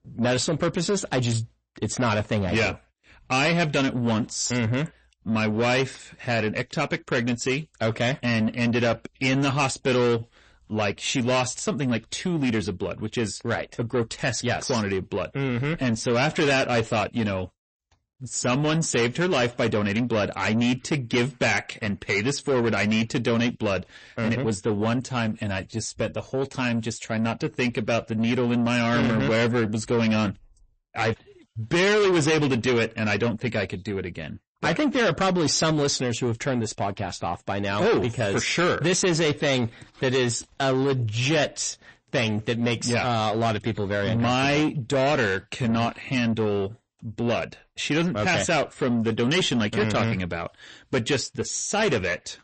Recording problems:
distortion; heavy; 7 dB below the speech
garbled, watery; slightly; nothing above 8 kHz

